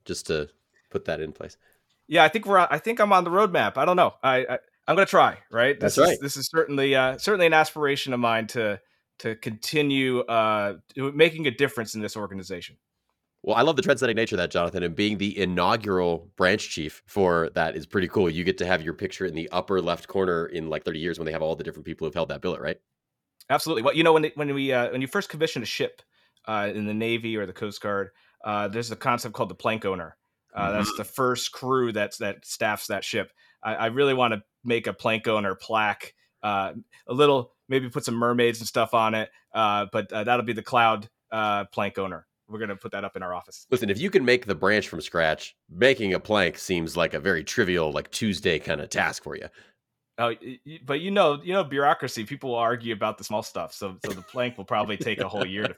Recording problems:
uneven, jittery; strongly; from 2 to 53 s

